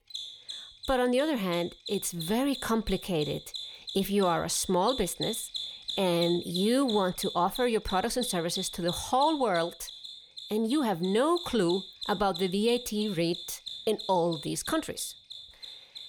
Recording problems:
machinery noise; loud; throughout; 10 dB below the speech

